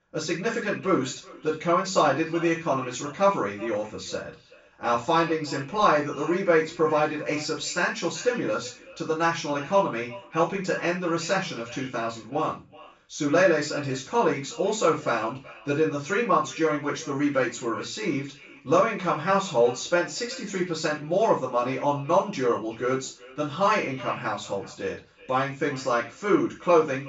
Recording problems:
off-mic speech; far
high frequencies cut off; noticeable; nothing above 8 kHz
echo of what is said; faint; throughout; 380 ms later, 20 dB below the speech
room echo; slight; dies away in 0.3 s

